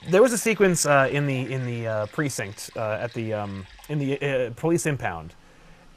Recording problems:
rain or running water; faint; throughout; 25 dB below the speech

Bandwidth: 14.5 kHz